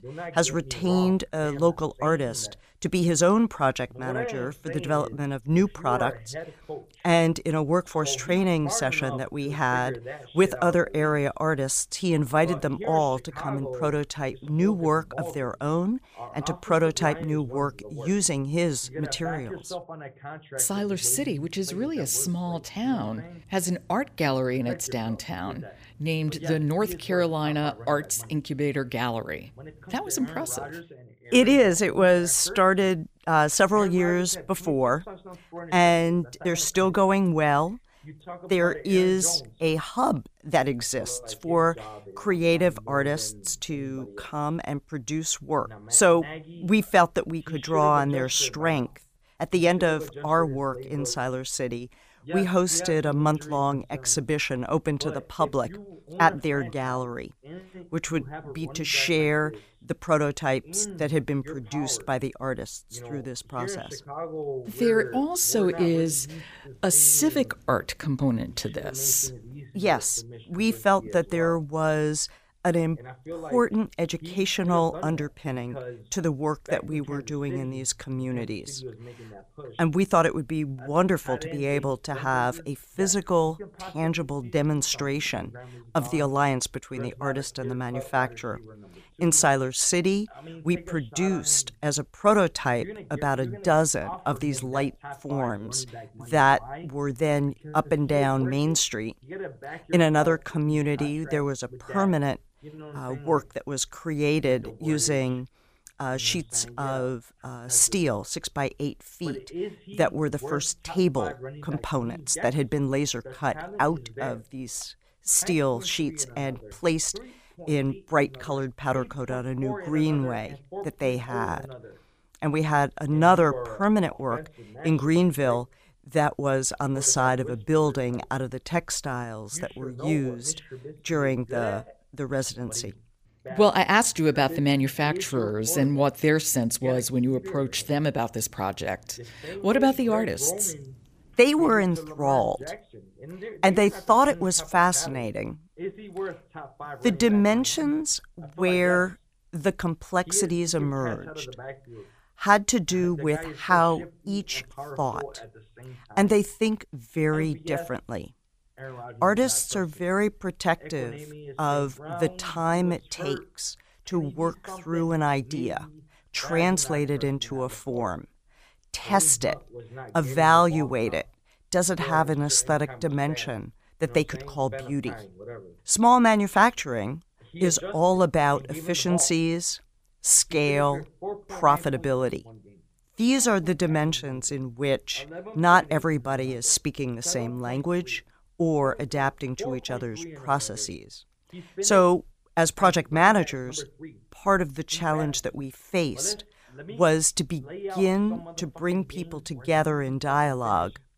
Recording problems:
voice in the background; noticeable; throughout; 15 dB below the speech

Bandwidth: 15 kHz